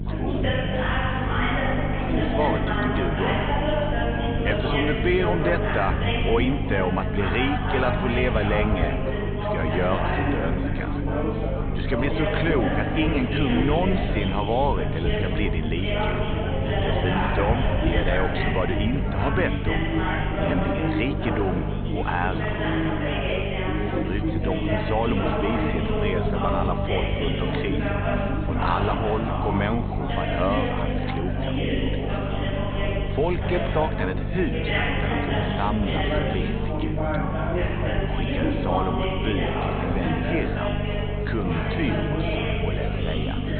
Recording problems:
high frequencies cut off; severe; nothing above 4 kHz
chatter from many people; very loud; throughout; 1 dB above the speech
electrical hum; noticeable; throughout; 50 Hz, 10 dB below the speech
low rumble; faint; throughout; 20 dB below the speech

